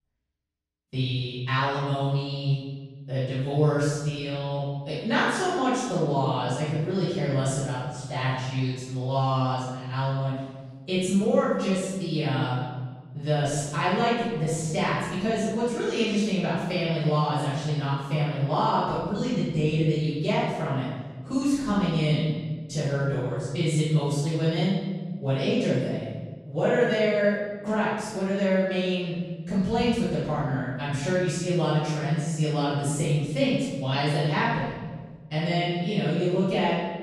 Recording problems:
room echo; strong; dies away in 1.4 s
off-mic speech; far

